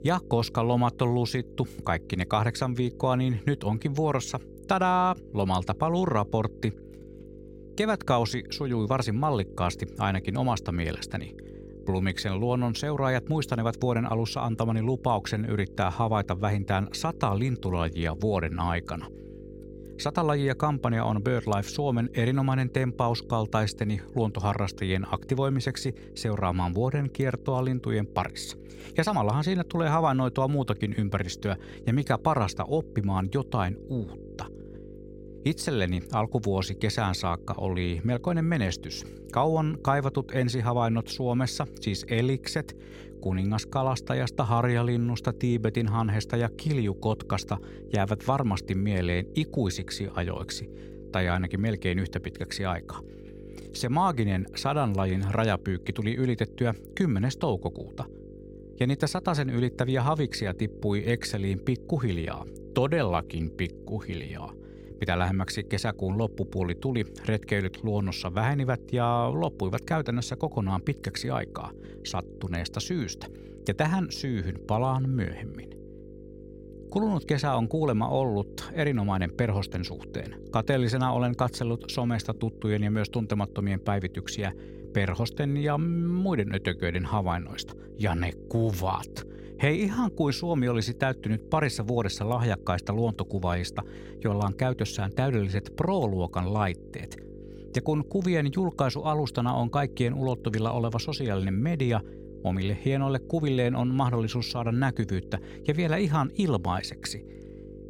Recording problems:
electrical hum; noticeable; throughout; 50 Hz, 20 dB below the speech

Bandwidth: 16 kHz